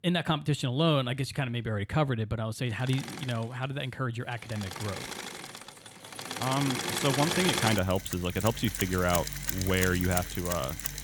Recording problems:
machinery noise; loud; throughout; 3 dB below the speech

